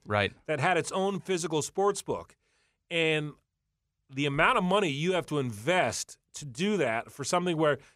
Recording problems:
none

